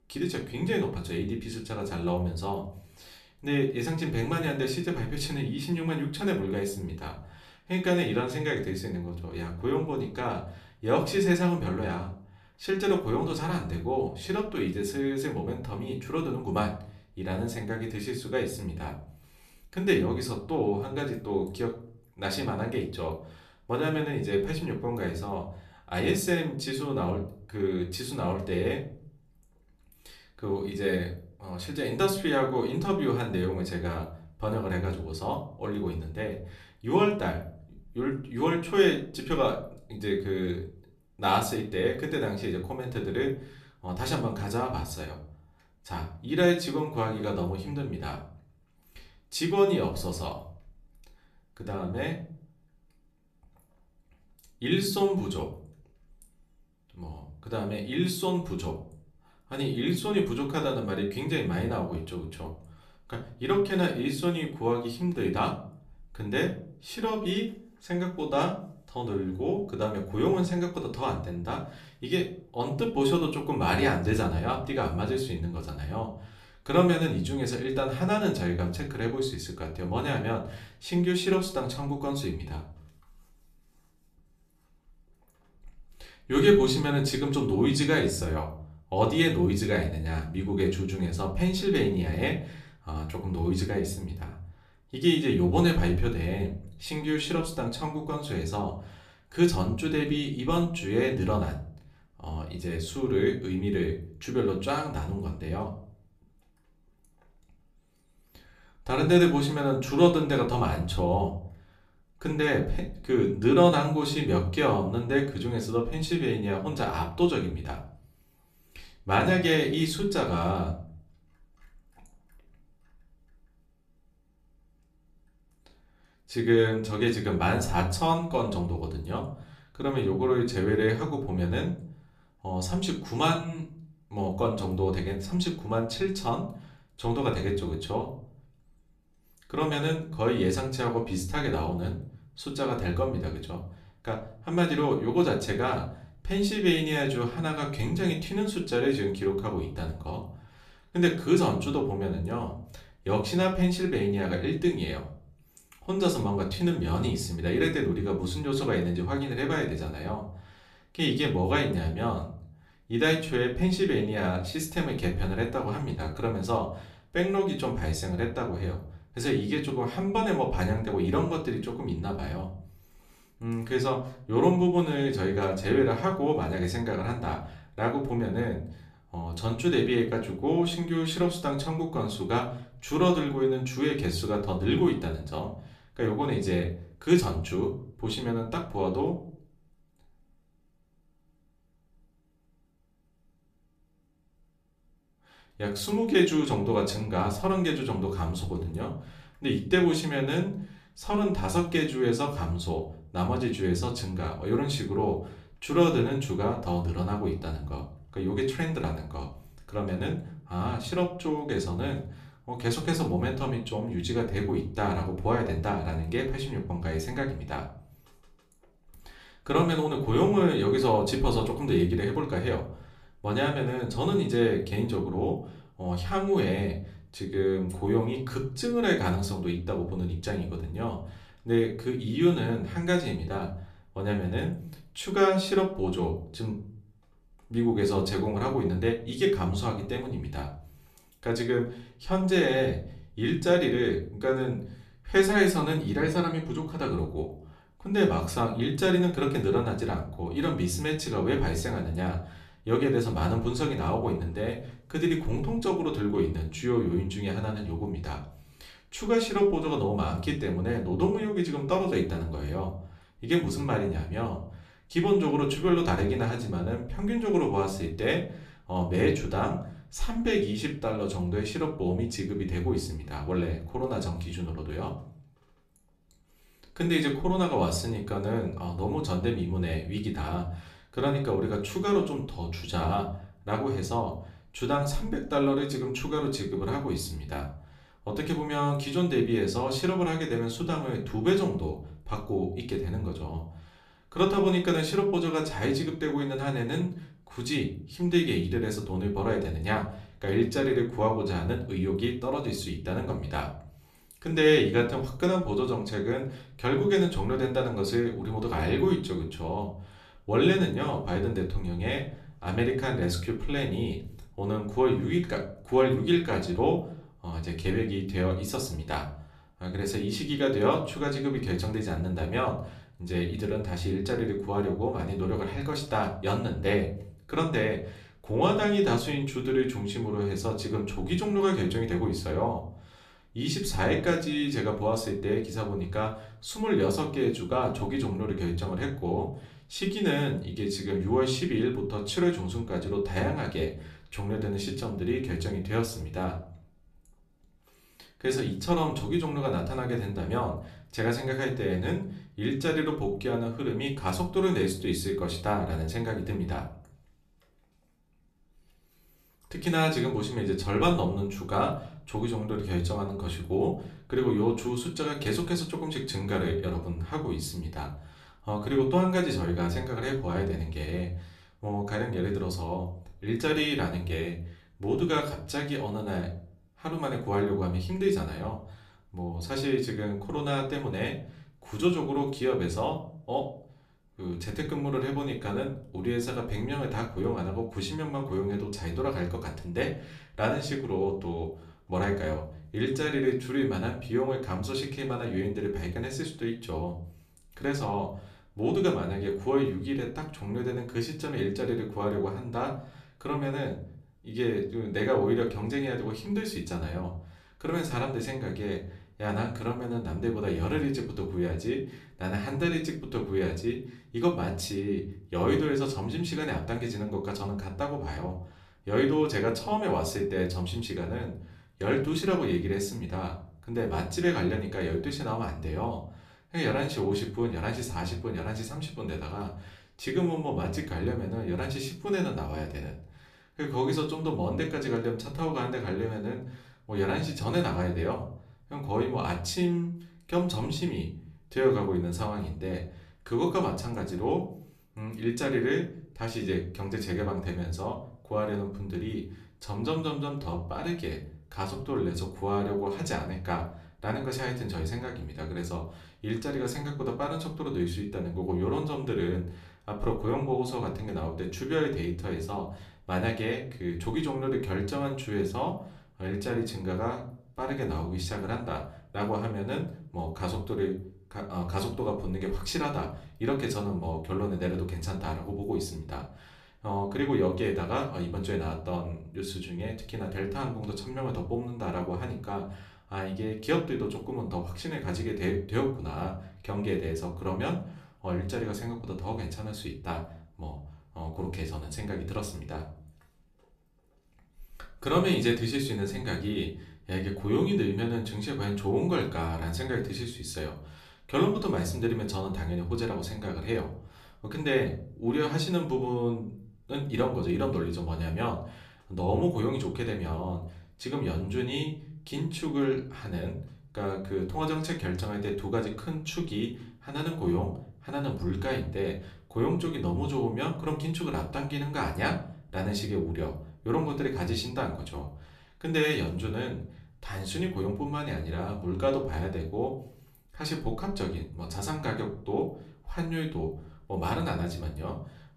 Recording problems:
room echo; slight; dies away in 0.4 s
off-mic speech; somewhat distant

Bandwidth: 14.5 kHz